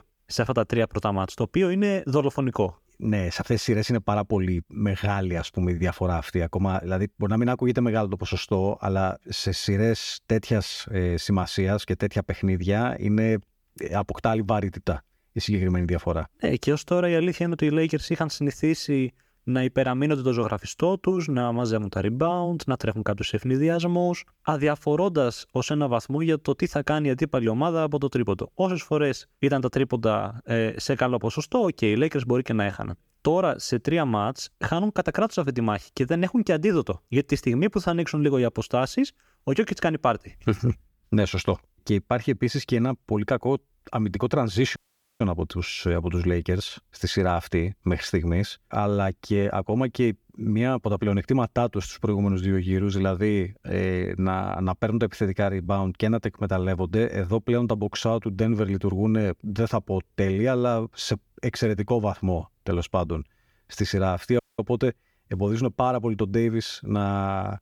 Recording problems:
audio cutting out; at 45 s and at 1:04

